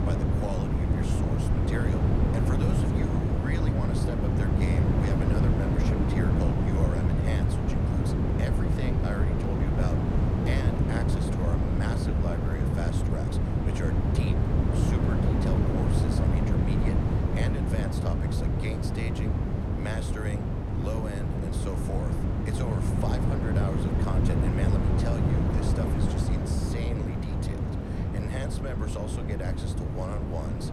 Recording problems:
wind noise on the microphone; heavy; 4 dB above the speech

